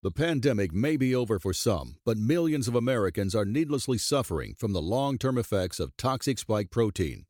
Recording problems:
none

